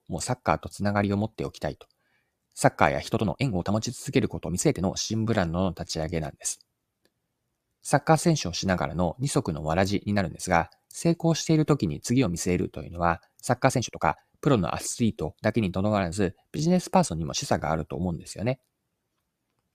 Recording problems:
uneven, jittery; strongly; from 0.5 to 18 s

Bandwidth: 14.5 kHz